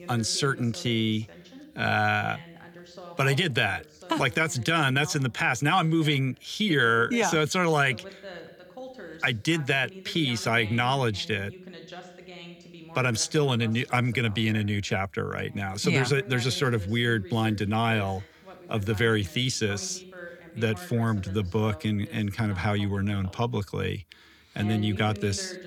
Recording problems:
voice in the background; noticeable; throughout; 20 dB below the speech

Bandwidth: 18.5 kHz